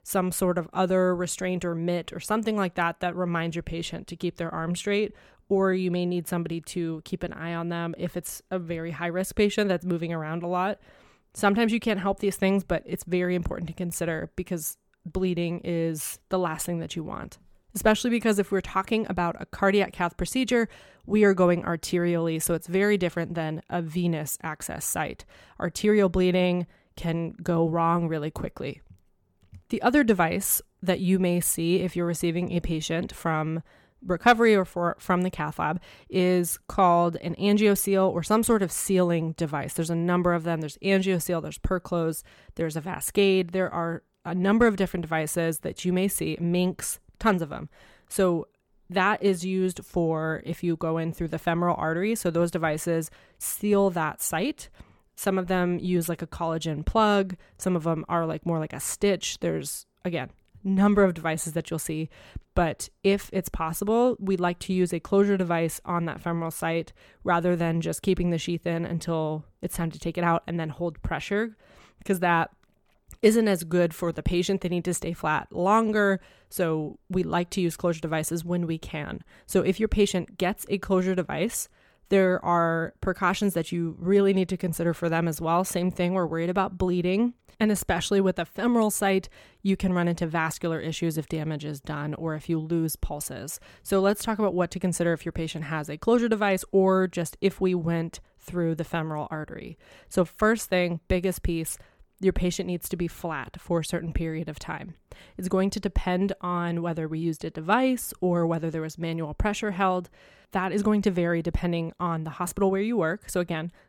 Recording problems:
none

